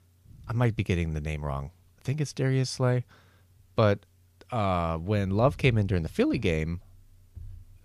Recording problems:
none

